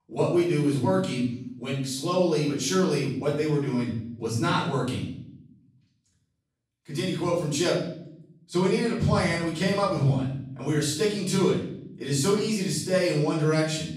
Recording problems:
off-mic speech; far
room echo; noticeable; dies away in 0.7 s

